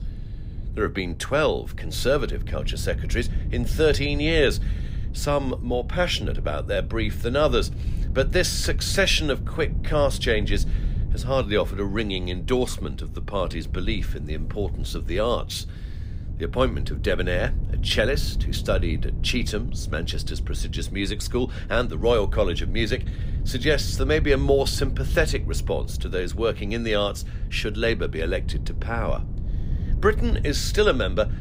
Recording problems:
wind noise on the microphone; occasional gusts; 20 dB below the speech

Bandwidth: 15.5 kHz